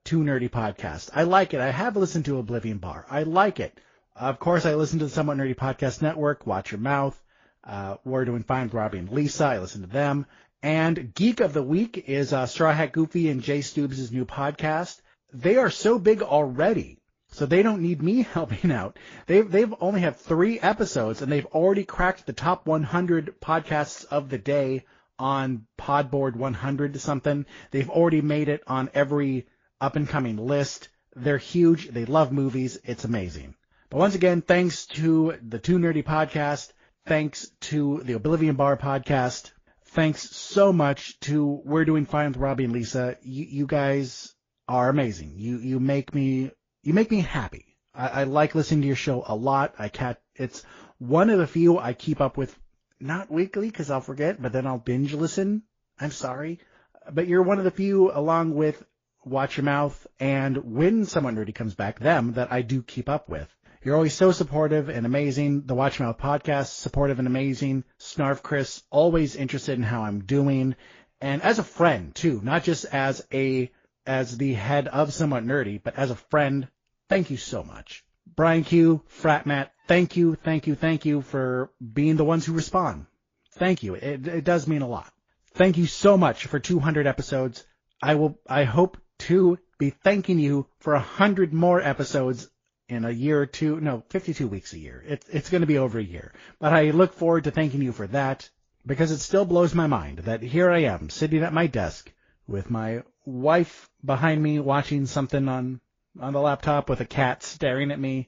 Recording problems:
garbled, watery; slightly

